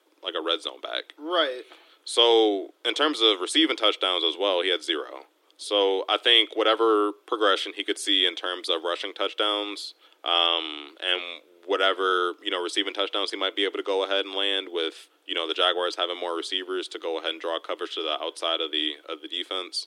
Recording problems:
thin; very; fading below 300 Hz

